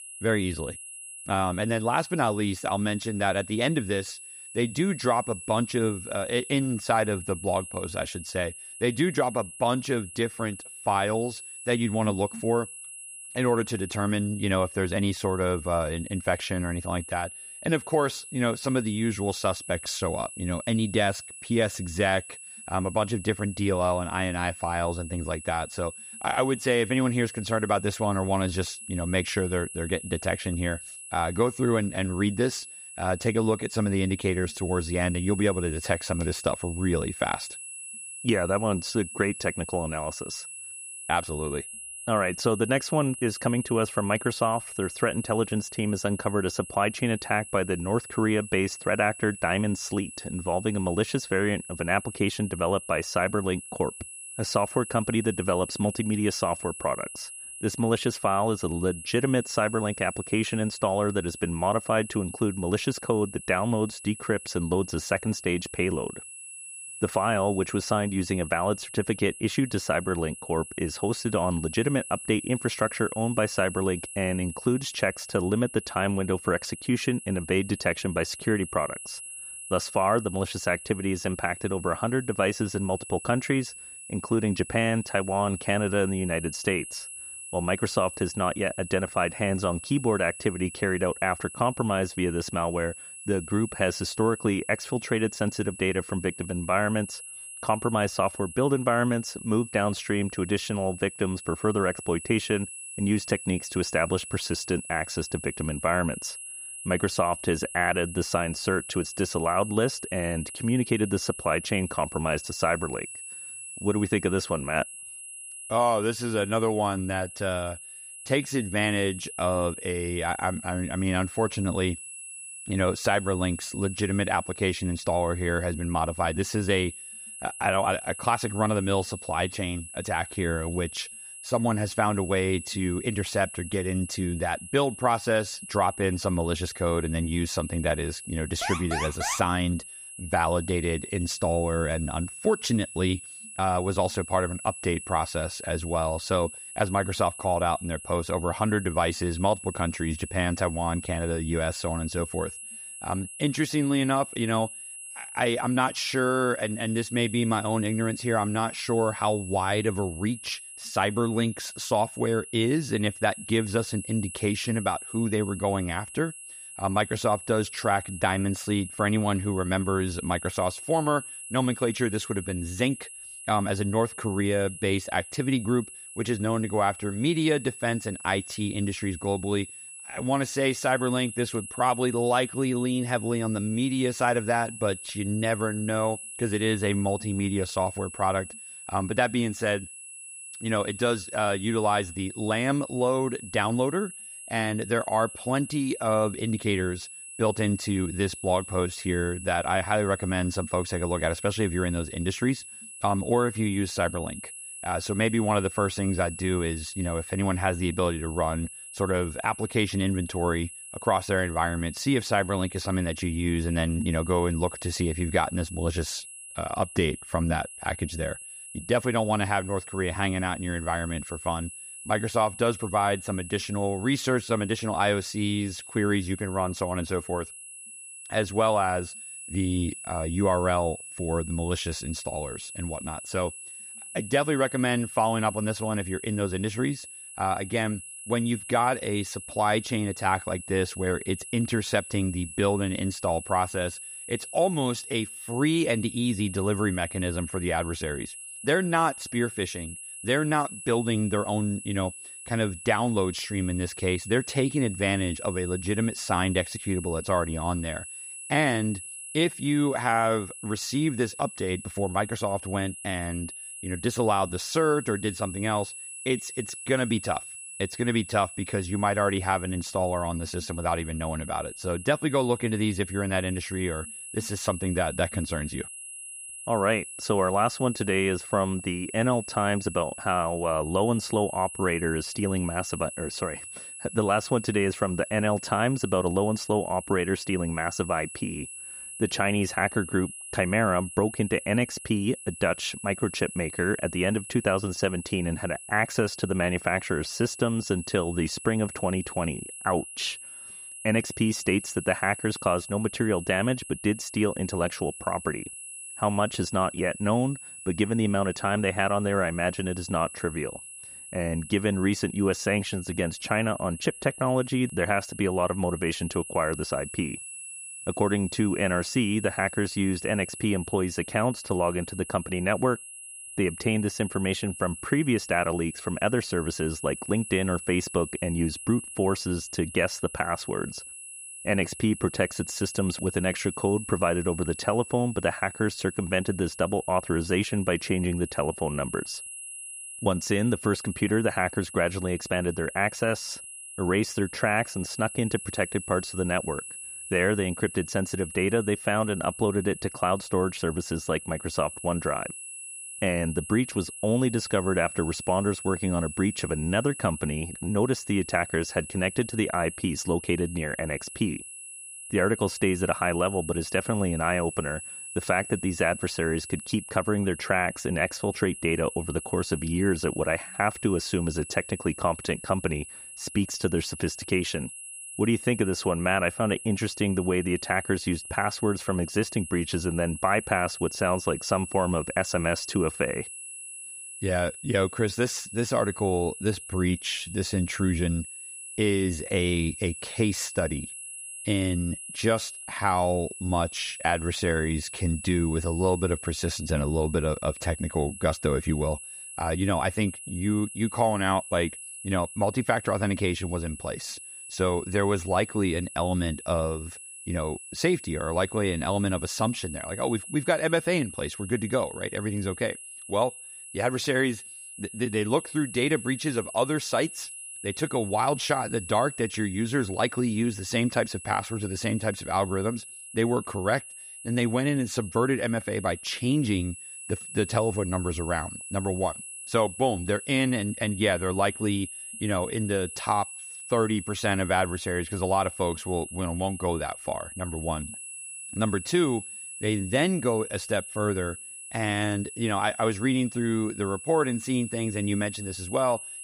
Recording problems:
high-pitched whine; noticeable; throughout; 10.5 kHz, 10 dB below the speech
alarm; noticeable; at 2:19; peak 3 dB below the speech

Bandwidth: 15.5 kHz